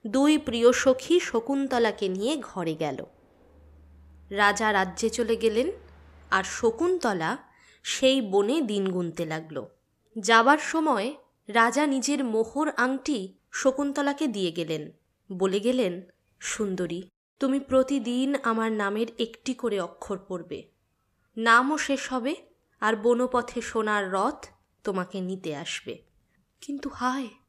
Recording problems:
train or aircraft noise; faint; until 7 s; 30 dB below the speech

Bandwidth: 14.5 kHz